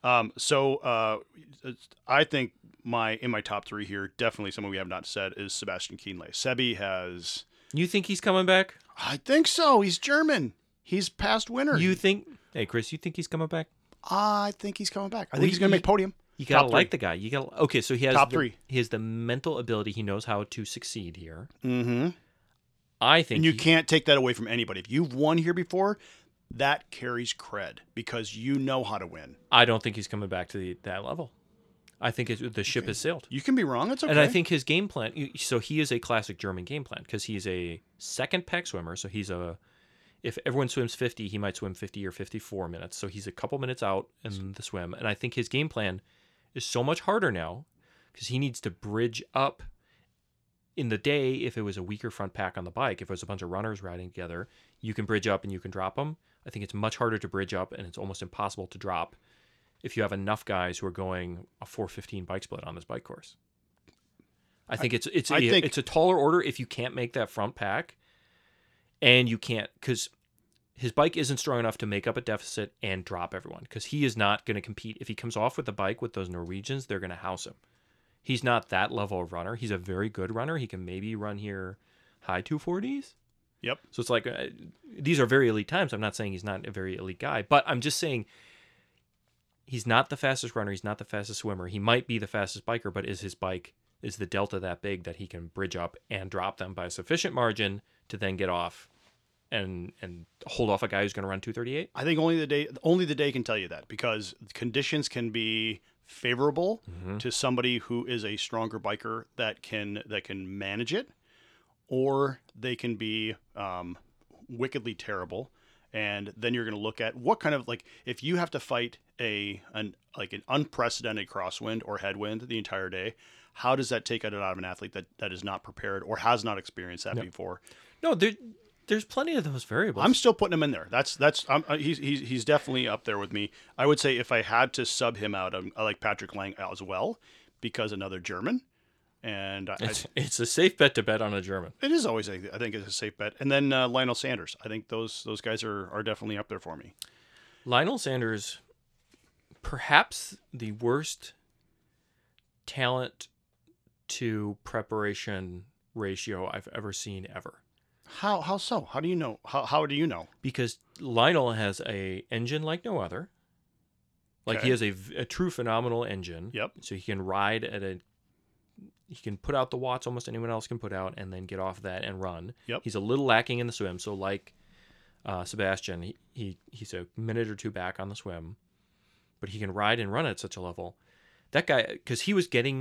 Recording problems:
abrupt cut into speech; at the end

